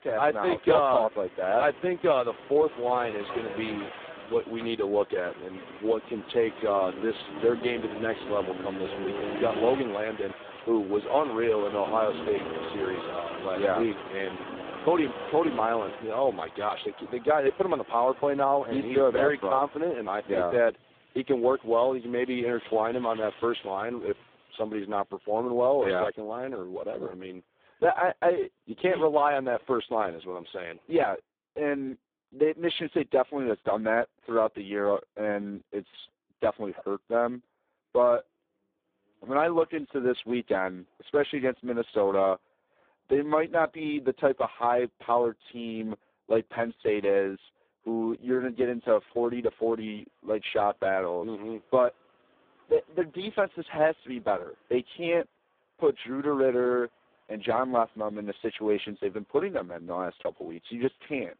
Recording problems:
phone-call audio; poor line
traffic noise; noticeable; throughout; 10 dB below the speech

